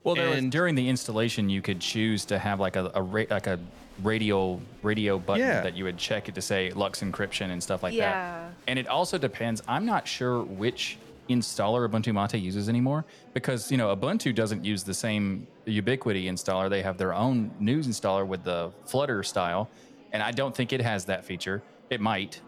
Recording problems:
murmuring crowd; faint; throughout; 25 dB below the speech

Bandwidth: 18.5 kHz